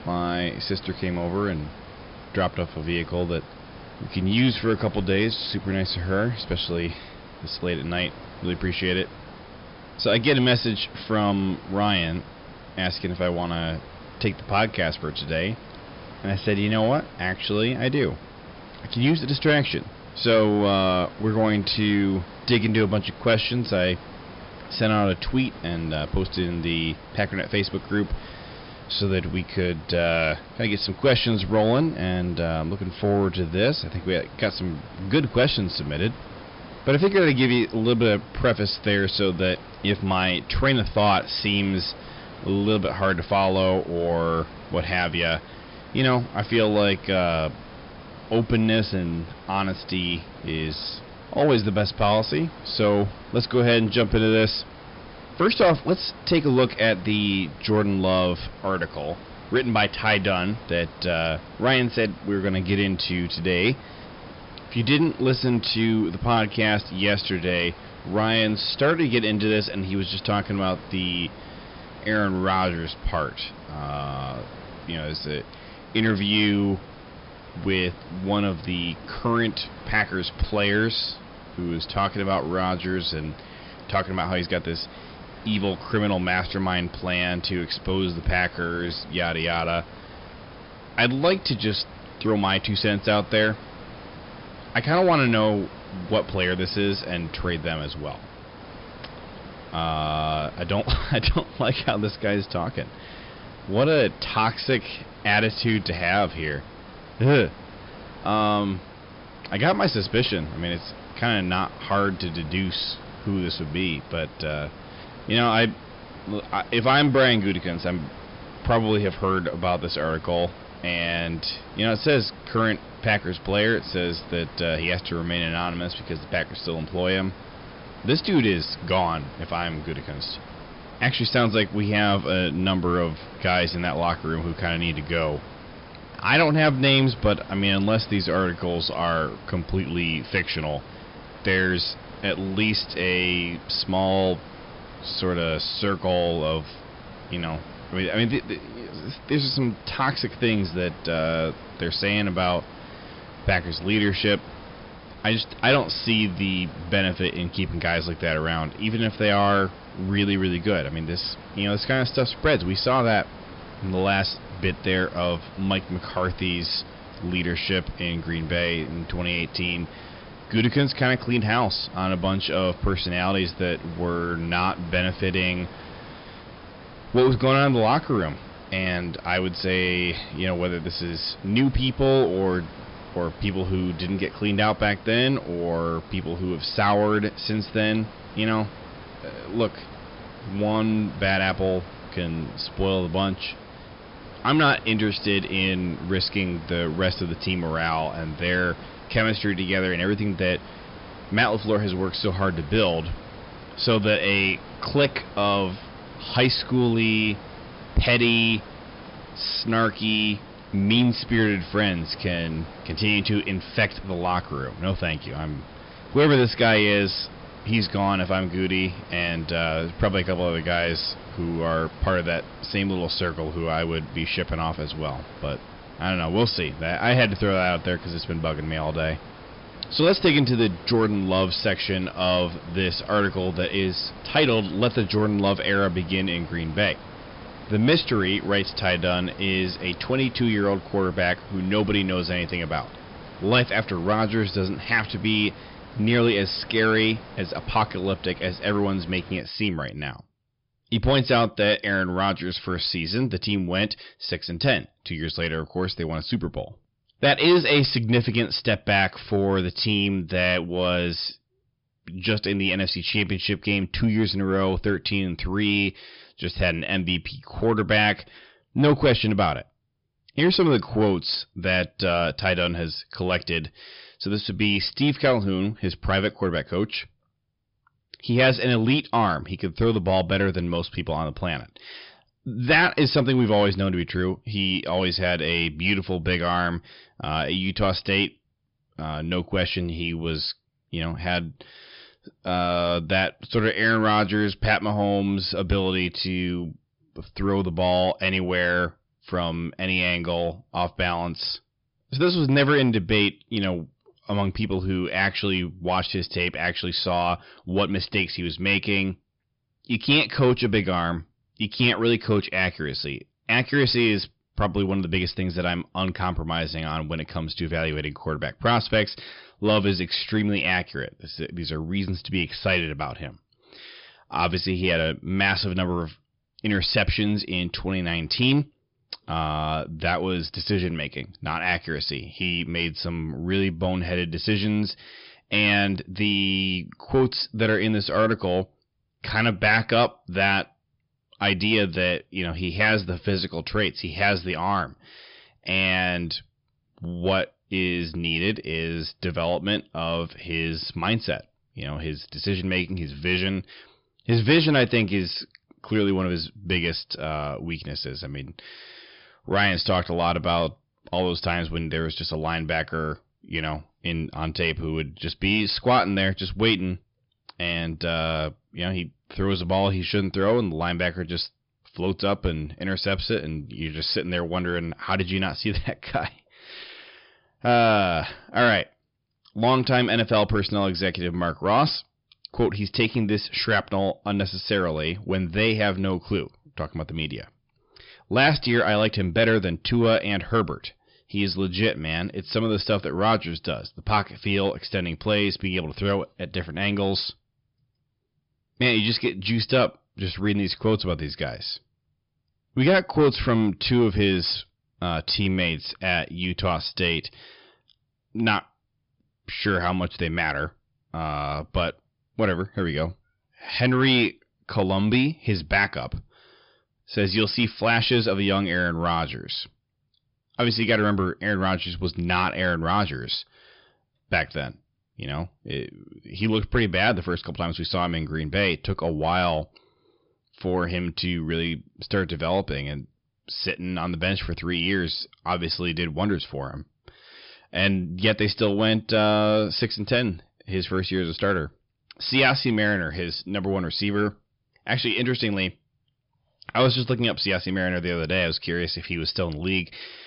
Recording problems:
high frequencies cut off; noticeable; nothing above 5.5 kHz
distortion; slight; 10 dB below the speech
hiss; noticeable; until 4:09; 20 dB below the speech

